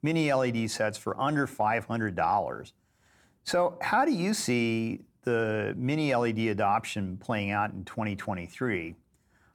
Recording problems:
none

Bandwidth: 18.5 kHz